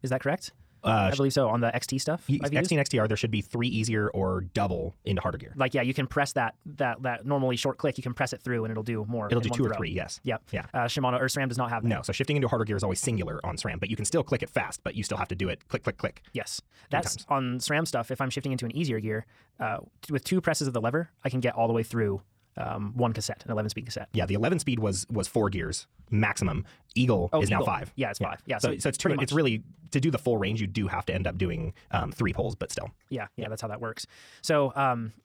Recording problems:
wrong speed, natural pitch; too fast; 1.5 times normal speed

